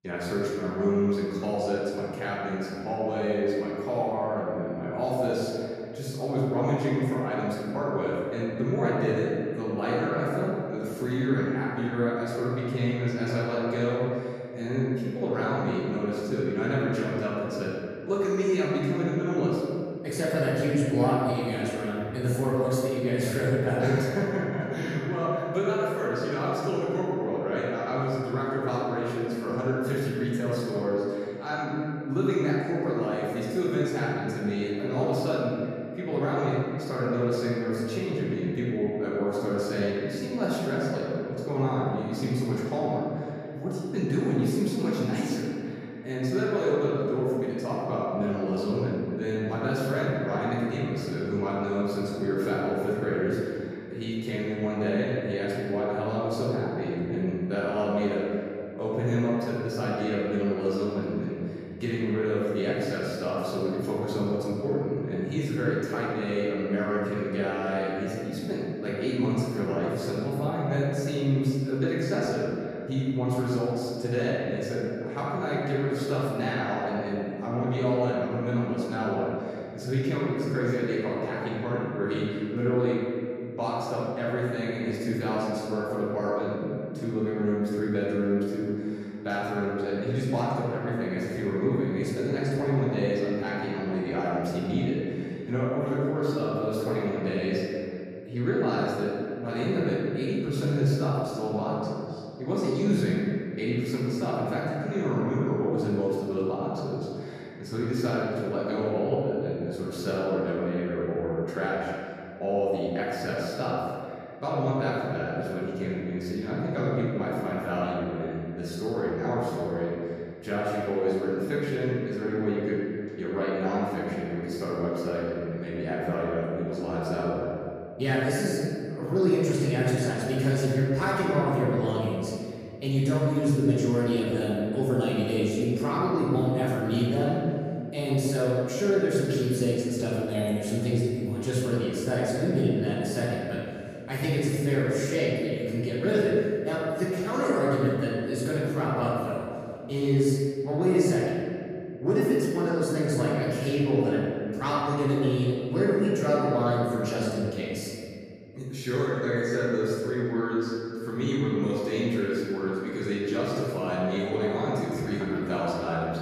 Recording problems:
room echo; strong; dies away in 2.2 s
off-mic speech; far

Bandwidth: 14.5 kHz